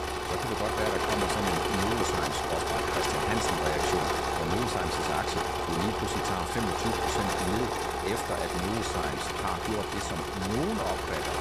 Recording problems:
echo of what is said; very faint; throughout; 370 ms later, 20 dB below the speech
machinery noise; very loud; throughout; 5 dB above the speech

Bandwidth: 14 kHz